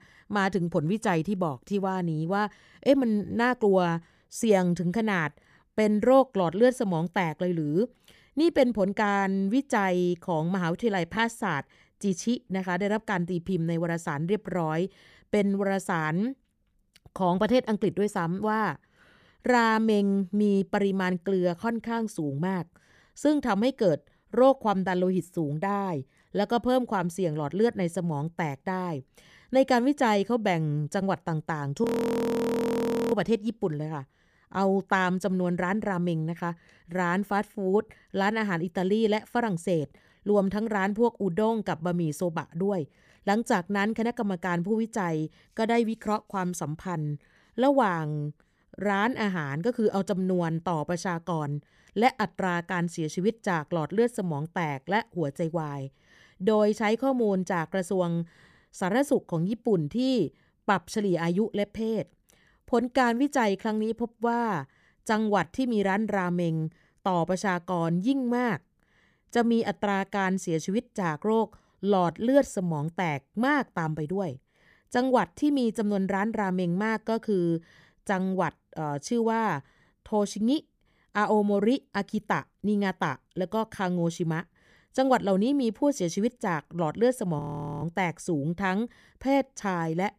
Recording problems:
audio freezing; at 32 s for 1.5 s and at 1:27

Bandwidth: 15 kHz